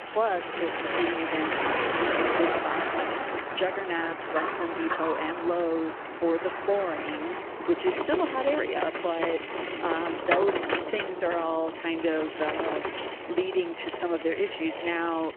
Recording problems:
phone-call audio
traffic noise; loud; throughout; 1 dB below the speech

